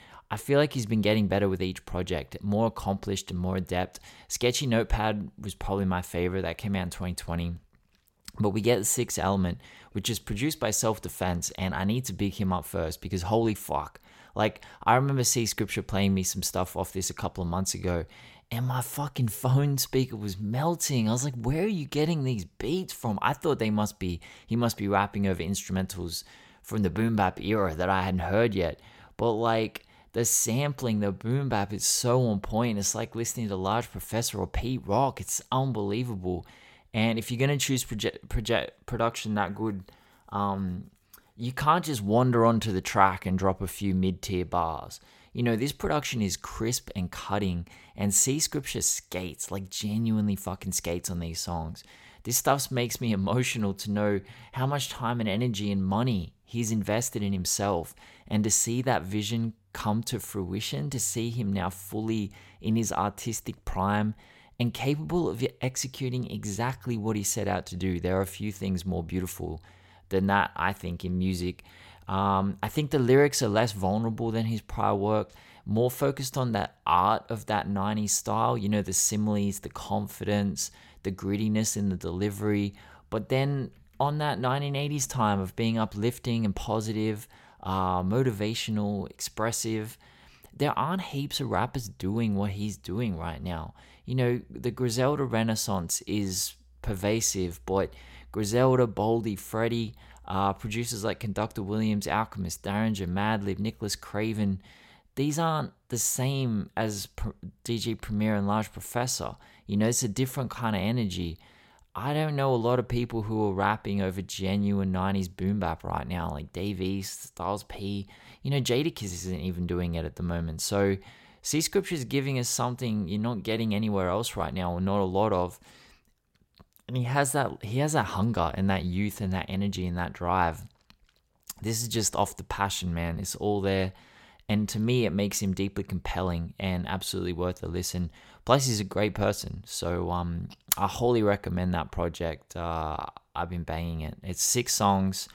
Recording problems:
none

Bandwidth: 16.5 kHz